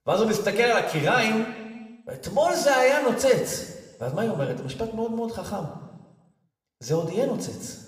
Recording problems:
room echo; slight; dies away in 1.1 s
off-mic speech; somewhat distant

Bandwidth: 15 kHz